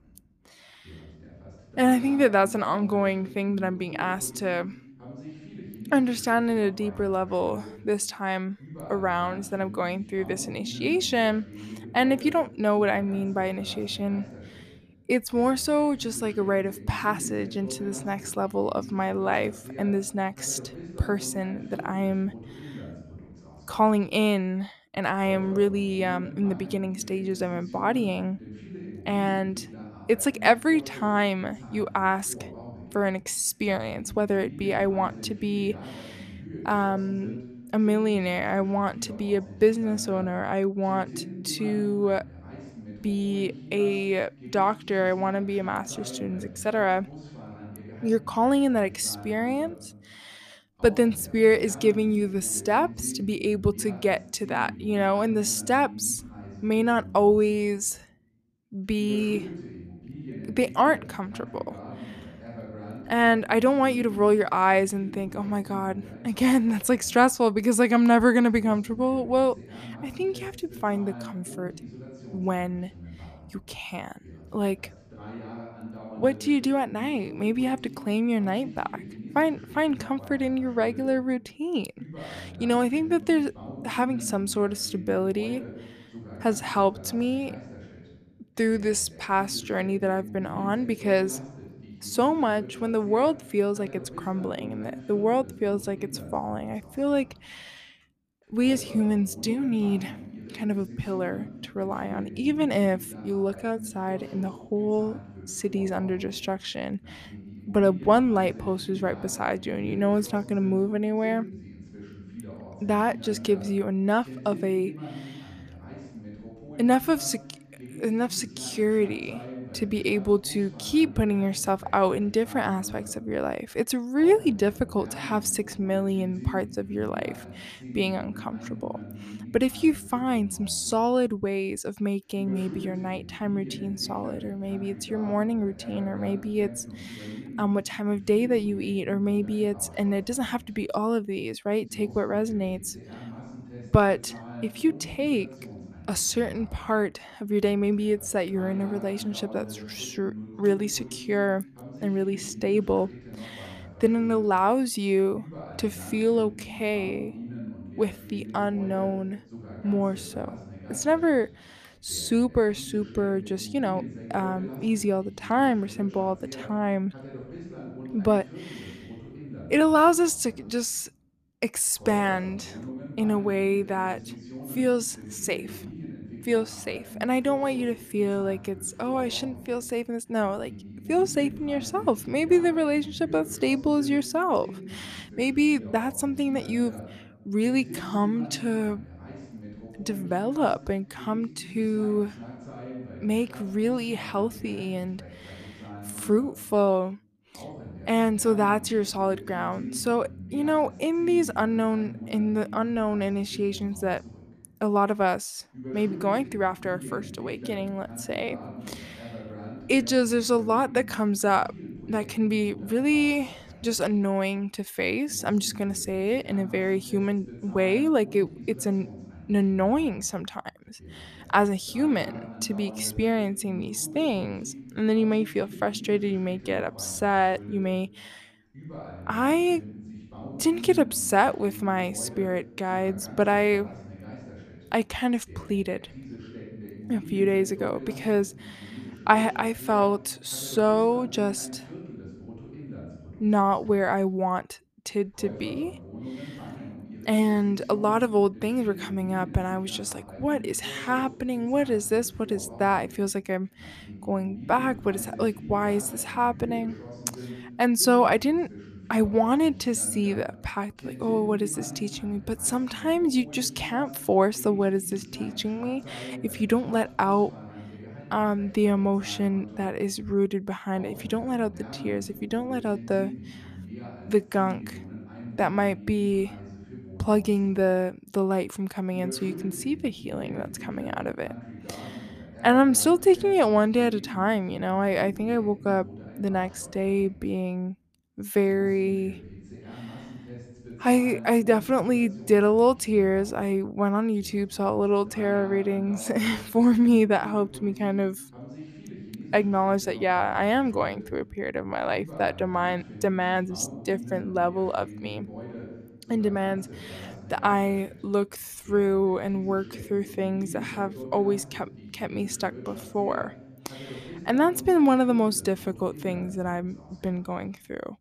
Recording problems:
voice in the background; noticeable; throughout; 15 dB below the speech

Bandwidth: 14.5 kHz